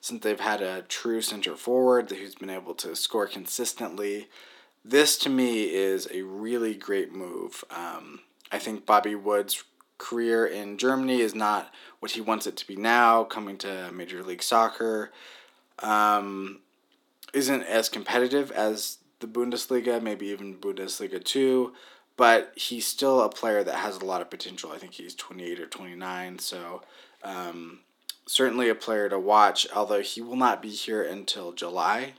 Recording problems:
thin; somewhat; fading below 300 Hz

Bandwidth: 17.5 kHz